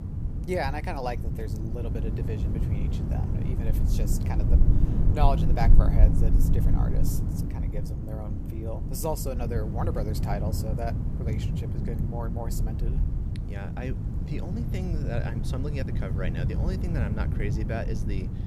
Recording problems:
wind noise on the microphone; heavy; 4 dB below the speech

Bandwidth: 14.5 kHz